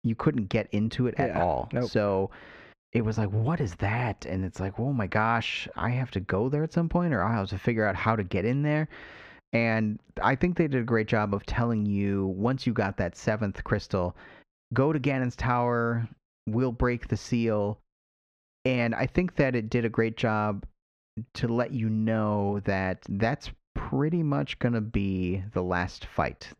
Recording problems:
muffled; slightly; fading above 2.5 kHz

